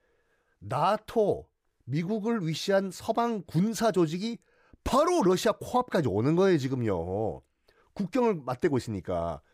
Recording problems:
none

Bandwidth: 15.5 kHz